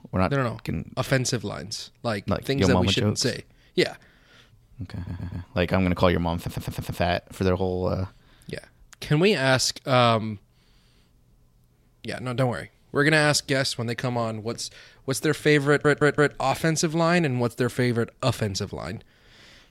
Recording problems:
audio stuttering; at 5 s, at 6.5 s and at 16 s

